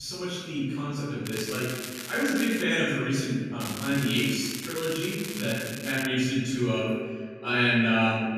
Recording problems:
room echo; strong; dies away in 1.4 s
off-mic speech; far
echo of what is said; noticeable; from 6 s on; 150 ms later, 15 dB below the speech
crackling; loud; from 1.5 to 2.5 s and from 3.5 to 6 s; 10 dB below the speech
abrupt cut into speech; at the start

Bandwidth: 14.5 kHz